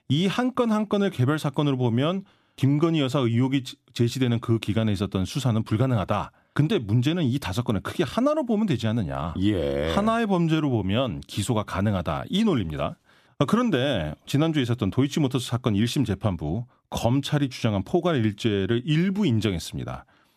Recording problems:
none

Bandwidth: 14.5 kHz